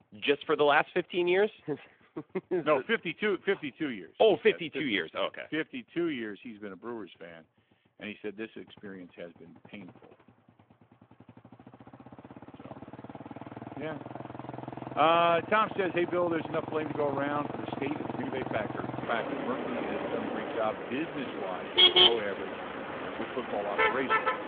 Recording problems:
phone-call audio; nothing above 3.5 kHz
traffic noise; very loud; throughout; as loud as the speech

